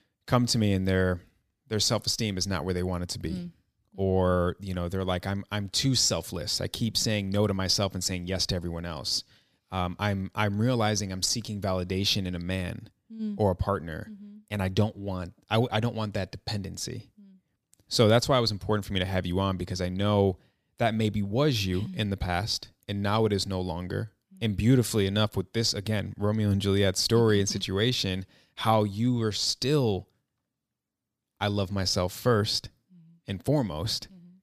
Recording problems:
none

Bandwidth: 15 kHz